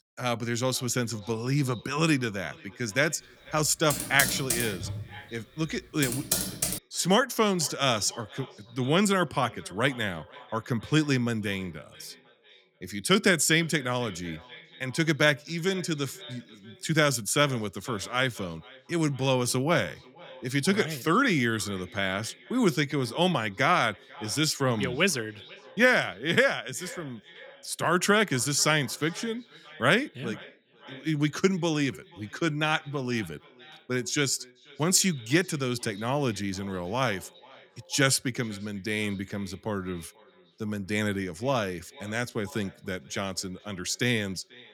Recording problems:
echo of what is said; faint; throughout; 490 ms later, 20 dB below the speech
keyboard typing; loud; from 4 to 7 s; peak 1 dB above the speech

